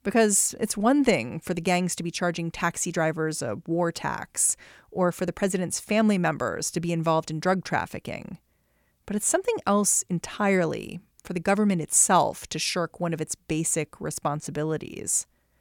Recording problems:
none

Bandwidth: 17.5 kHz